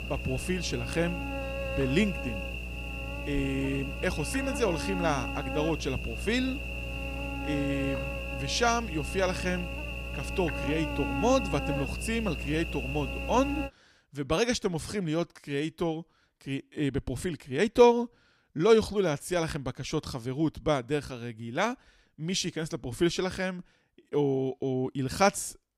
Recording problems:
electrical hum; loud; until 14 s; 60 Hz, 5 dB below the speech

